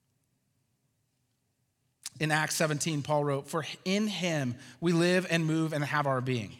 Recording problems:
none

